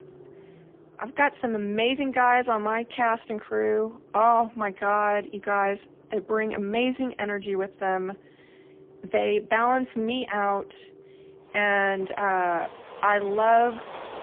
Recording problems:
phone-call audio; poor line; nothing above 3 kHz
traffic noise; faint; throughout; 25 dB below the speech

